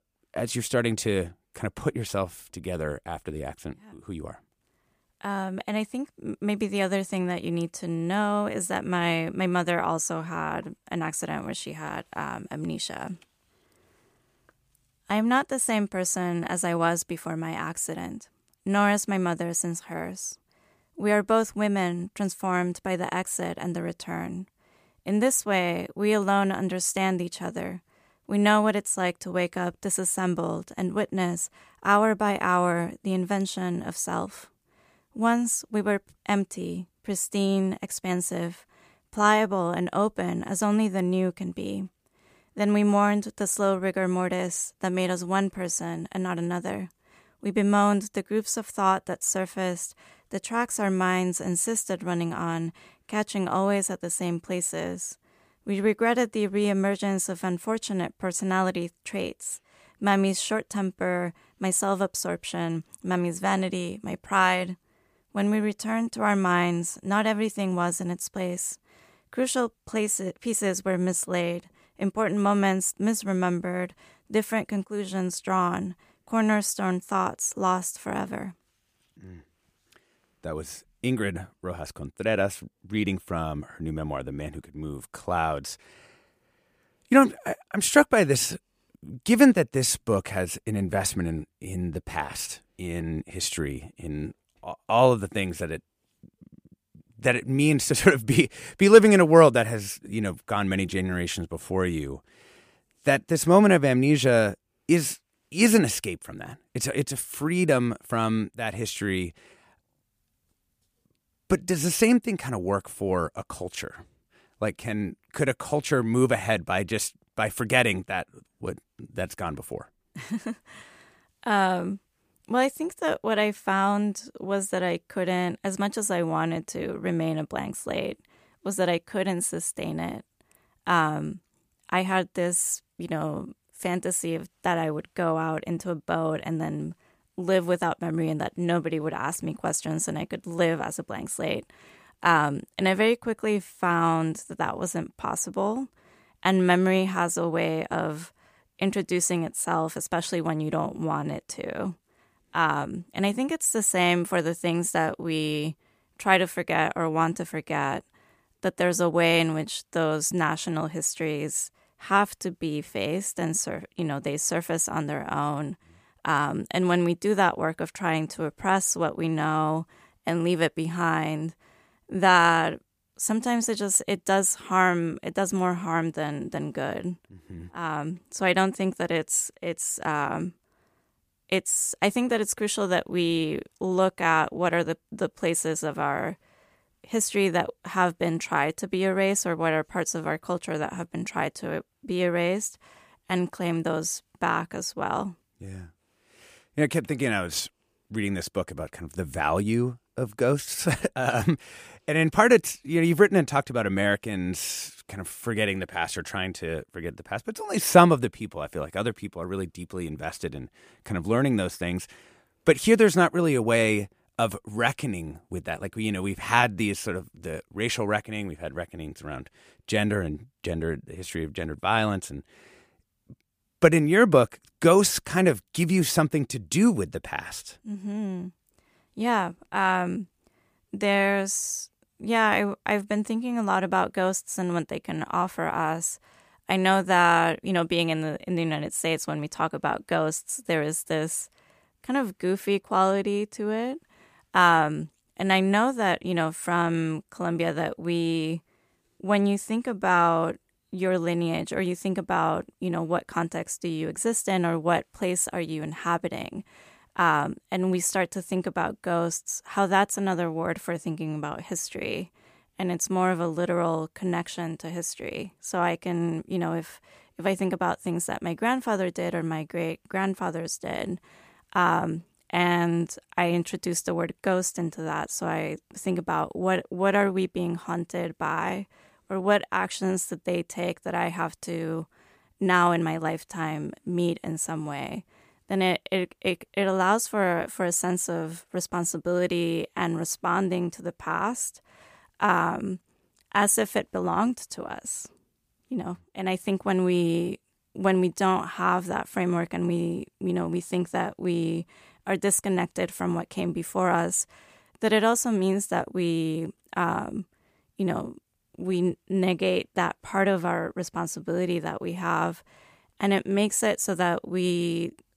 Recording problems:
none

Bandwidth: 15 kHz